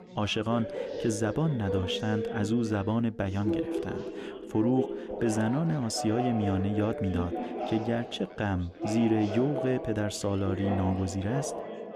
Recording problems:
chatter from many people; loud; throughout; 6 dB below the speech

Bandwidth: 14.5 kHz